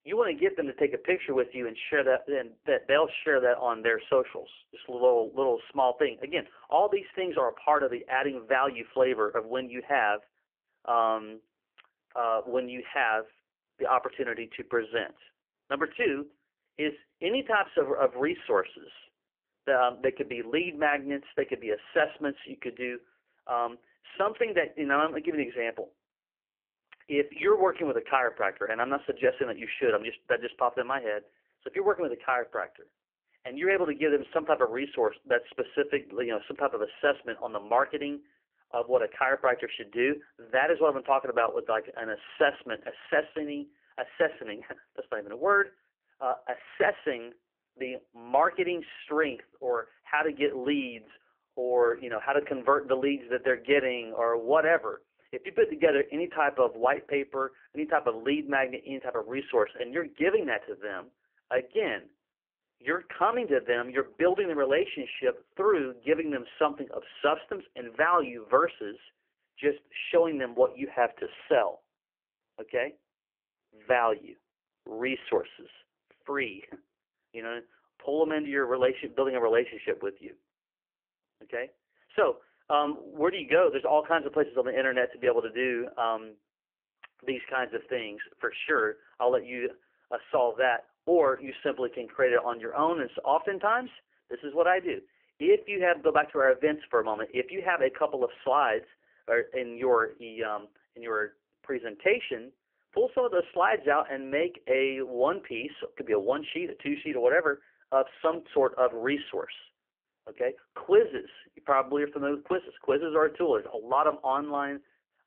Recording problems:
phone-call audio; poor line; nothing above 3 kHz

